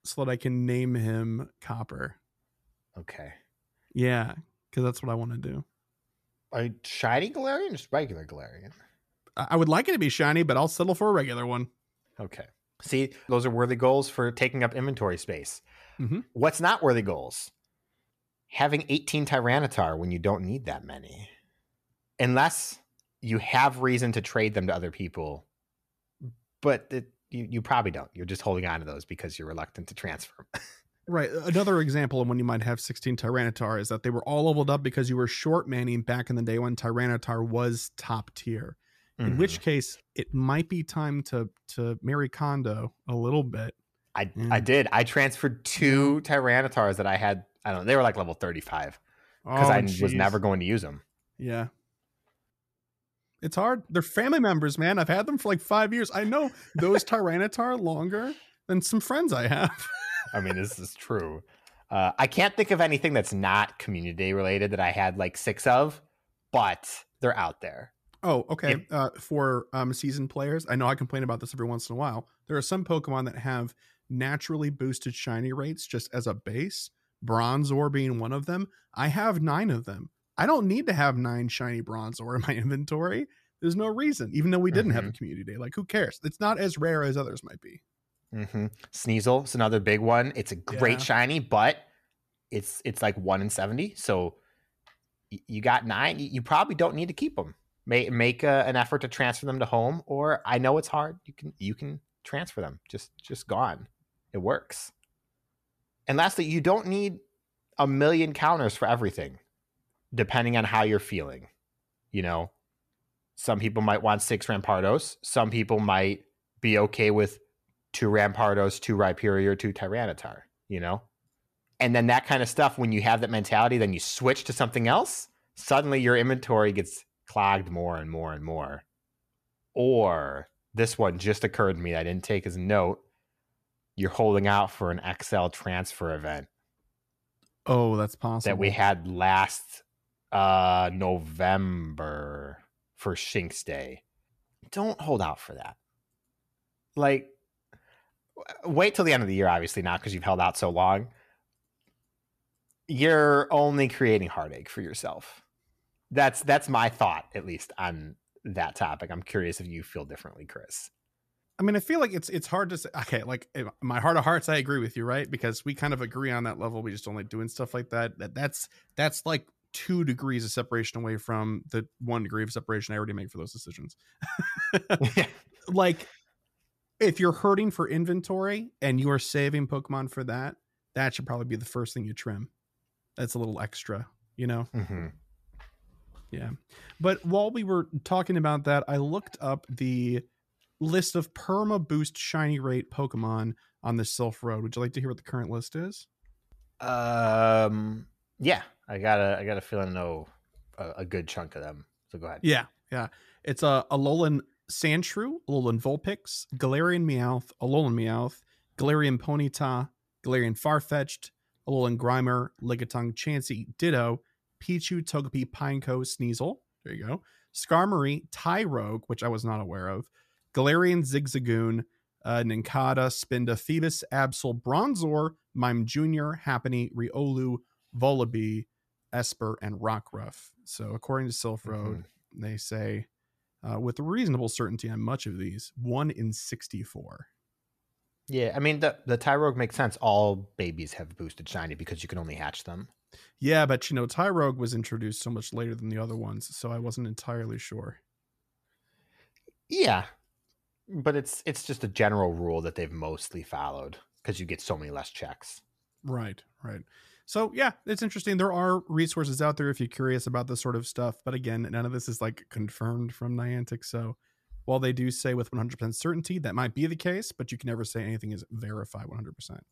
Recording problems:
none

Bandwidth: 14.5 kHz